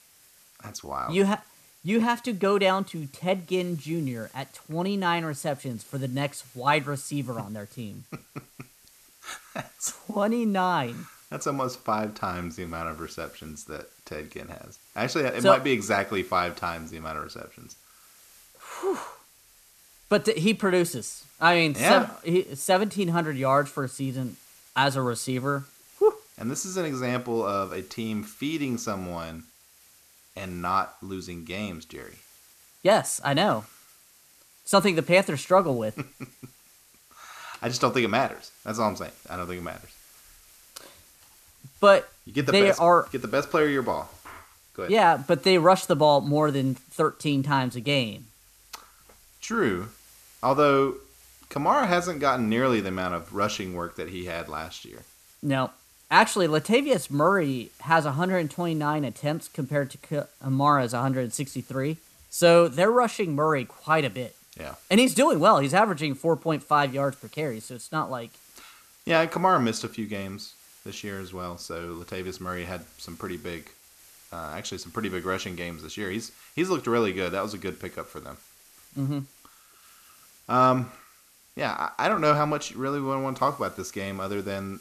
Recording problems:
hiss; faint; throughout; 25 dB below the speech

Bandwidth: 14 kHz